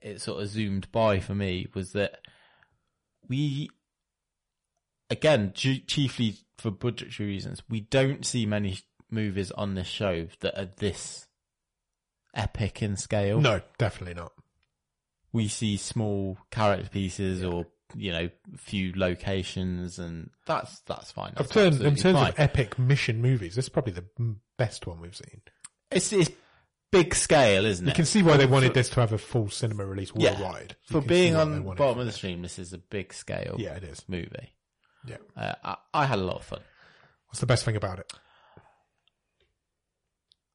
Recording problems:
distortion; slight; 10 dB below the speech
garbled, watery; slightly; nothing above 10.5 kHz

